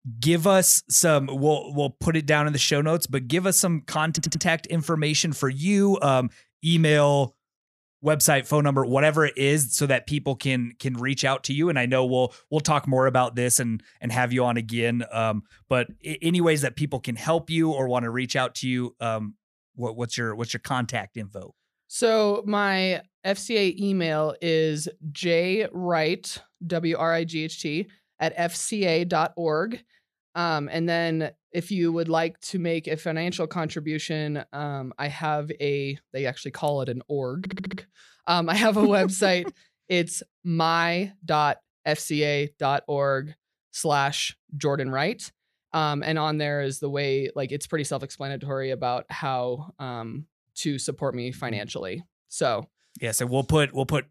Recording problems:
audio stuttering; at 4 s and at 37 s

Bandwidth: 14.5 kHz